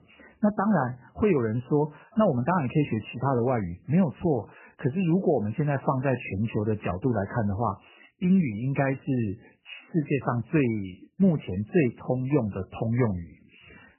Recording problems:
garbled, watery; badly; nothing above 3 kHz

